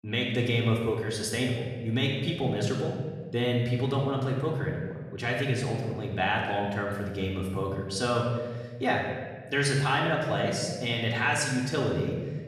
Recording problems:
off-mic speech; far
room echo; noticeable; dies away in 1.3 s

